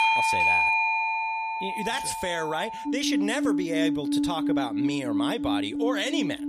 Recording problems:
alarms or sirens; very loud; throughout; 4 dB above the speech

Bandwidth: 14.5 kHz